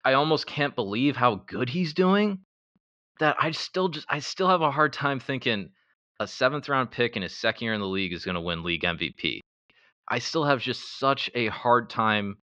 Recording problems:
muffled; slightly; fading above 4.5 kHz

